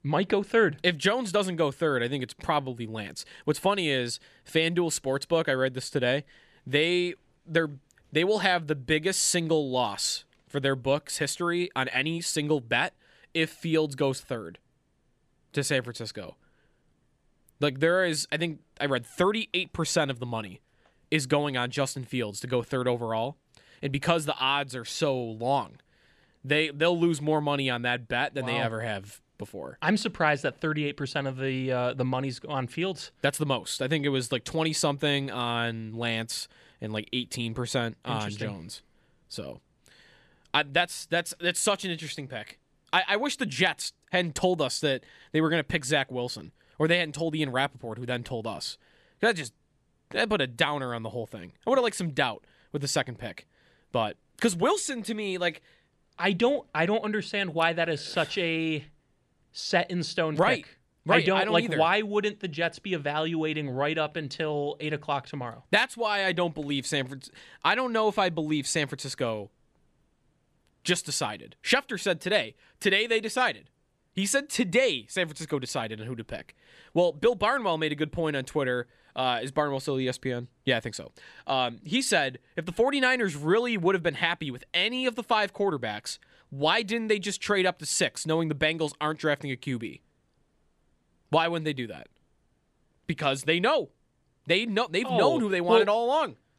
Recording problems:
none

